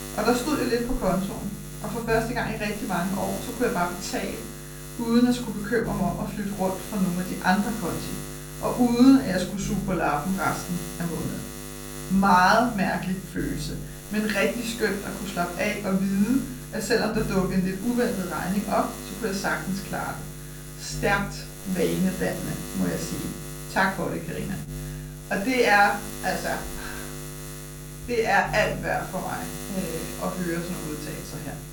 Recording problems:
off-mic speech; far
room echo; slight; dies away in 0.4 s
electrical hum; noticeable; throughout; 50 Hz, 15 dB below the speech

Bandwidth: 18 kHz